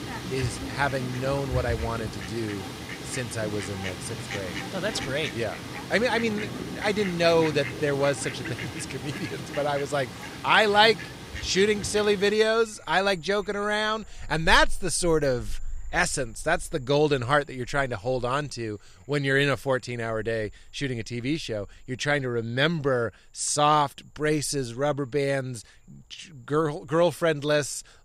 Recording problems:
animal sounds; loud; throughout; 10 dB below the speech

